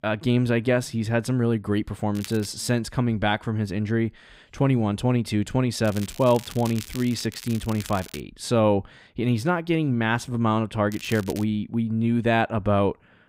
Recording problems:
crackling; noticeable; at 2 s, from 6 to 8 s and at 11 s; 15 dB below the speech

